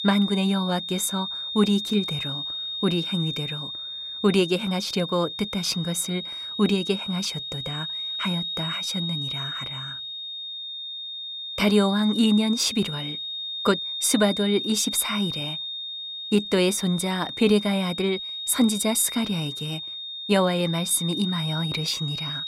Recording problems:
high-pitched whine; loud; throughout; 3.5 kHz, 5 dB below the speech

